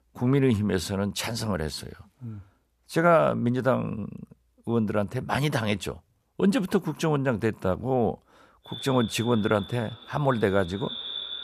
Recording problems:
echo of what is said; strong; from 8.5 s on; 580 ms later, 10 dB below the speech

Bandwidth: 14.5 kHz